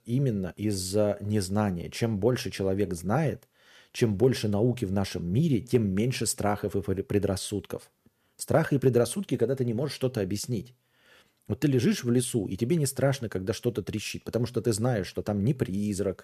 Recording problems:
none

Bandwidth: 14.5 kHz